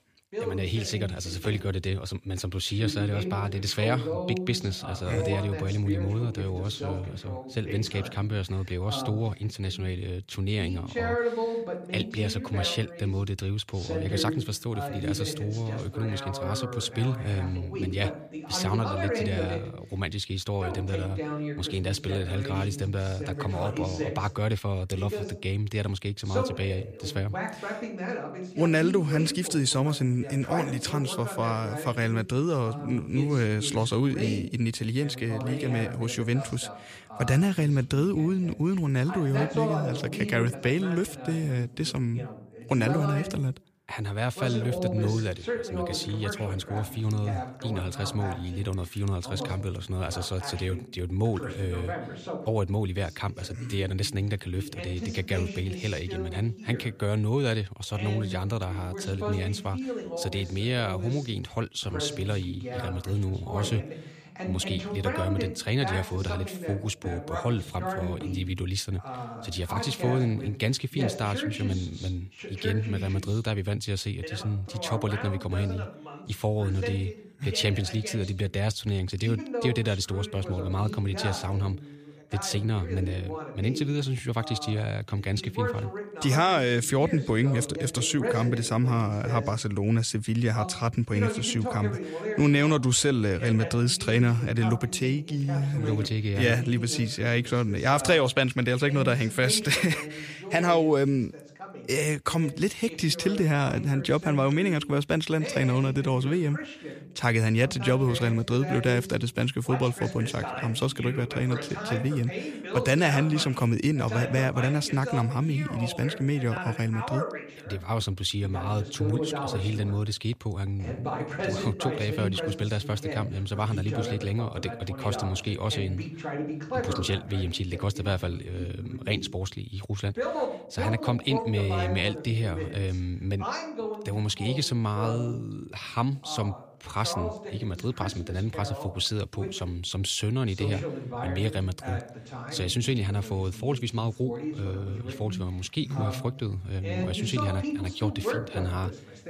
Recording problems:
voice in the background; loud; throughout; 8 dB below the speech

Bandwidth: 15 kHz